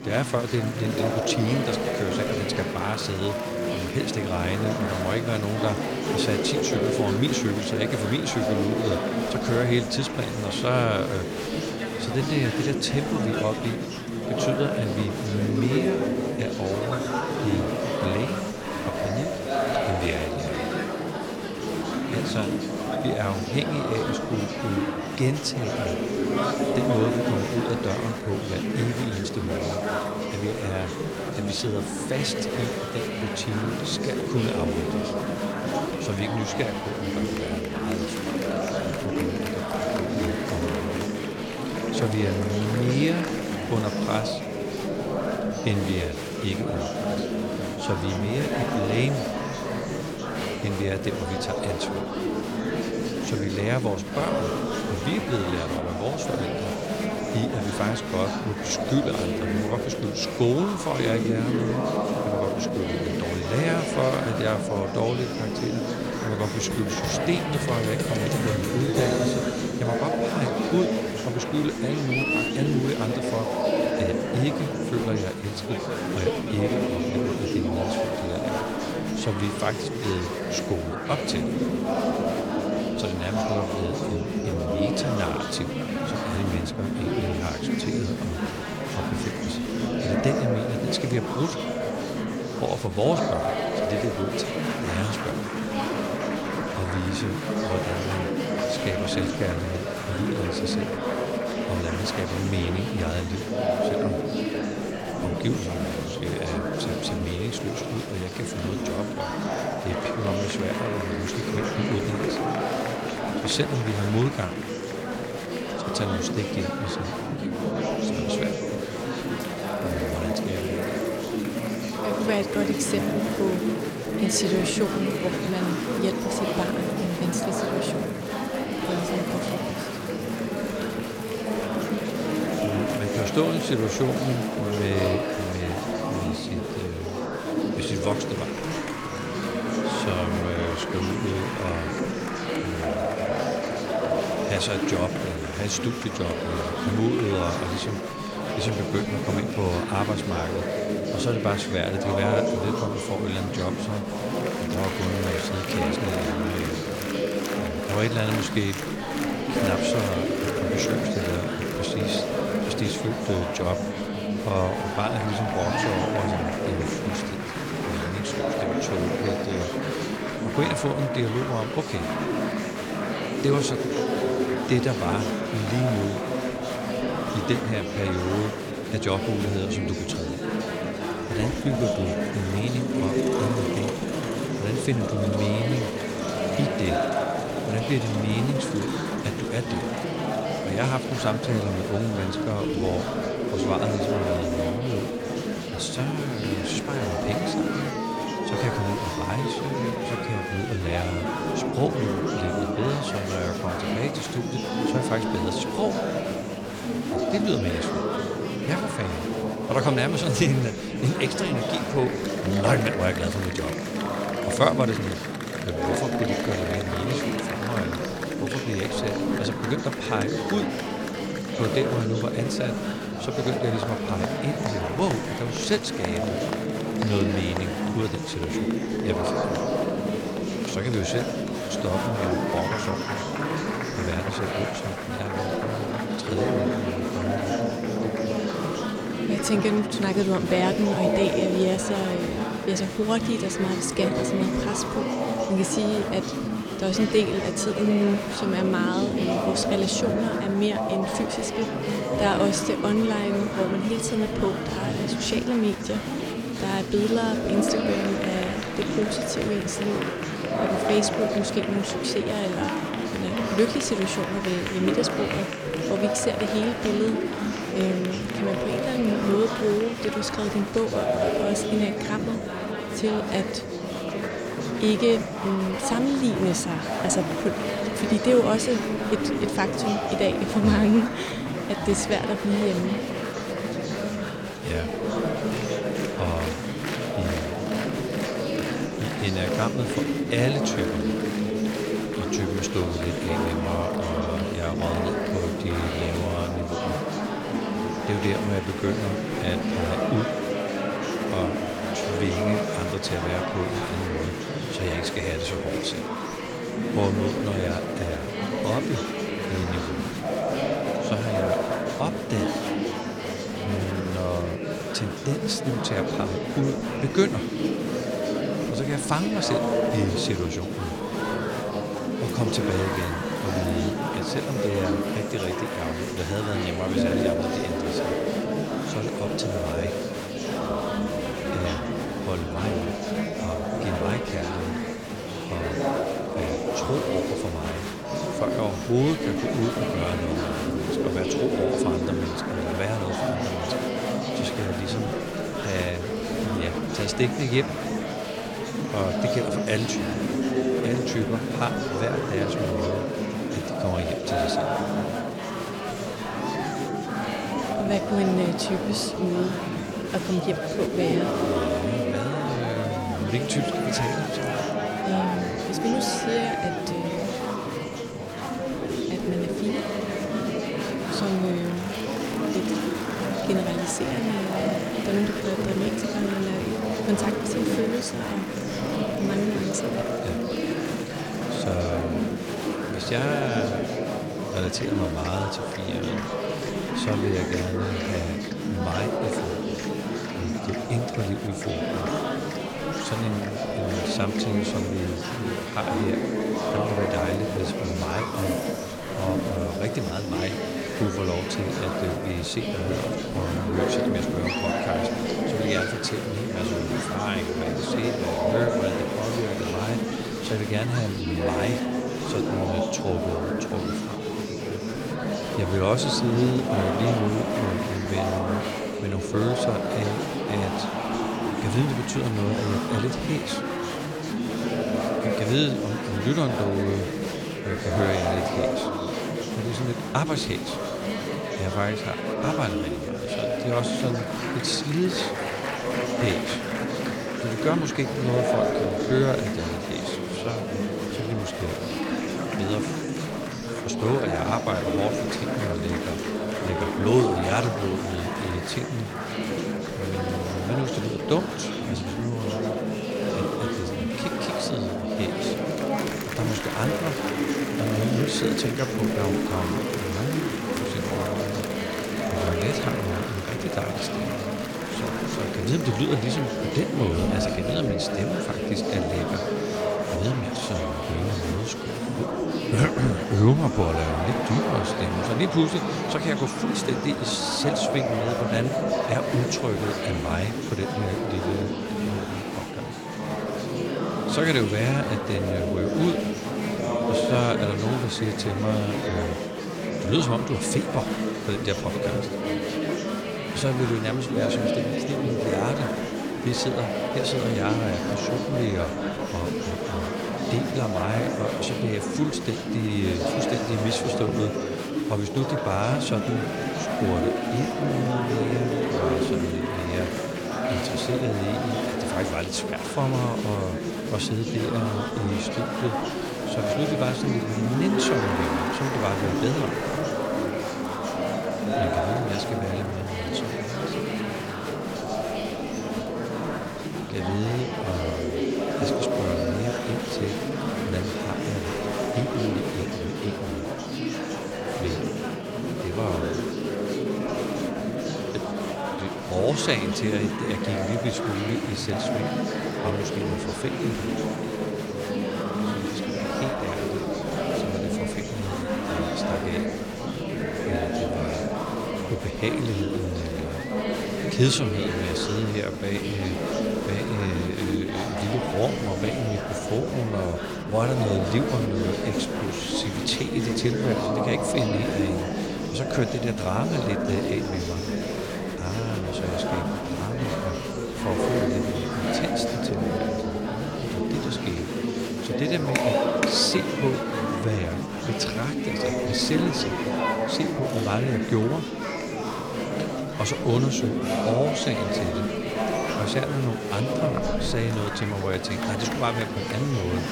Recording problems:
murmuring crowd; very loud; throughout; 1 dB above the speech

